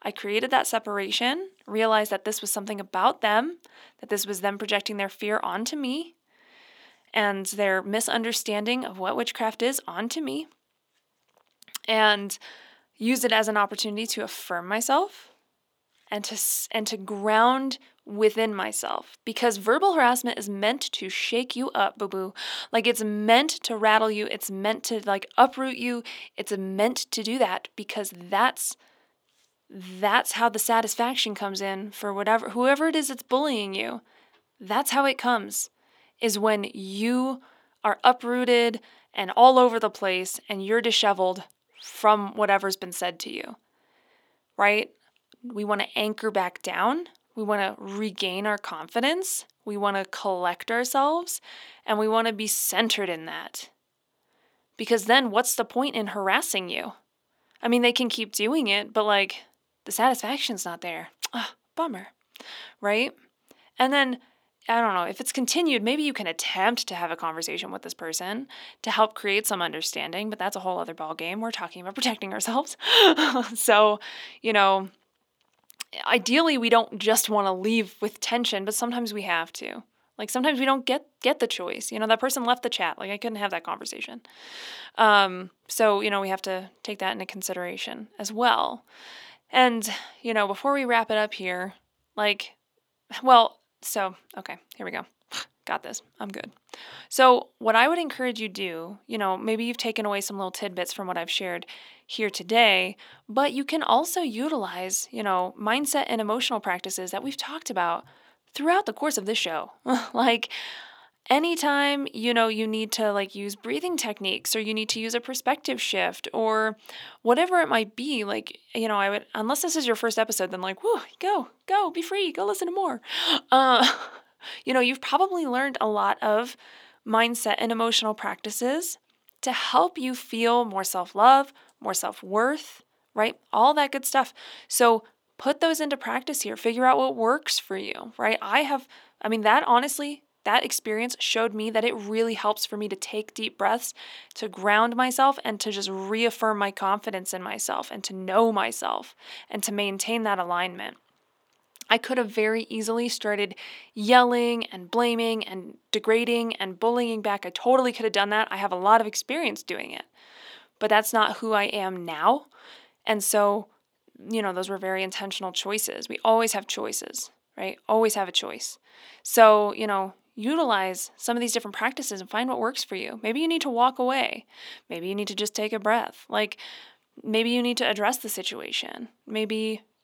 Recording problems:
thin; very slightly; fading below 300 Hz

